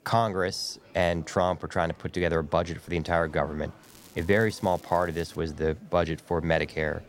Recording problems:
murmuring crowd; faint; throughout; 25 dB below the speech
crackling; faint; from 4 to 5.5 s; 25 dB below the speech

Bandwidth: 16 kHz